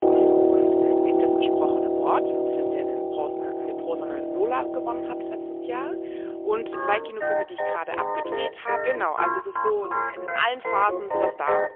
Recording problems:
phone-call audio; poor line; nothing above 3.5 kHz
background music; very loud; throughout; 4 dB above the speech

